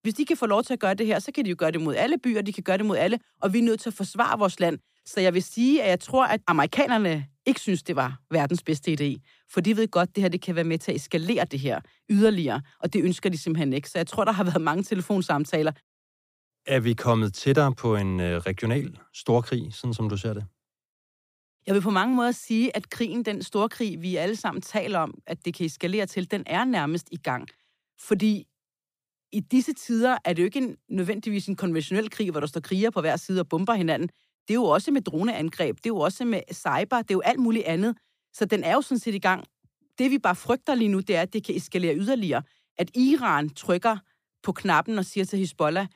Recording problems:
none

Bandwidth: 15 kHz